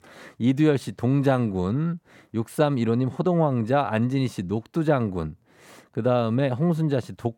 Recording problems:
none

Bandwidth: 17.5 kHz